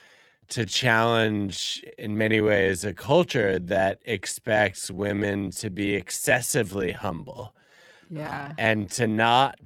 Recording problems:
wrong speed, natural pitch; too slow; 0.6 times normal speed

